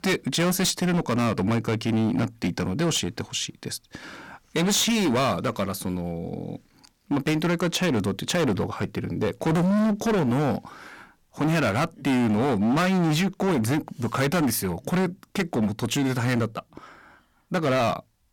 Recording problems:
distortion; heavy; 19% of the sound clipped

